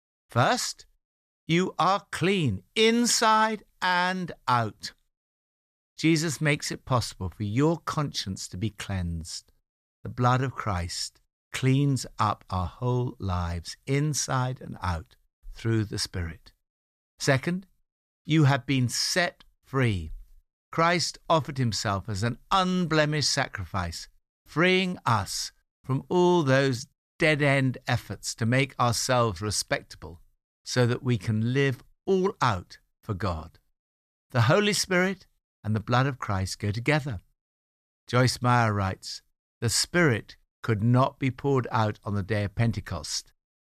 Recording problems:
none

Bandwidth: 14.5 kHz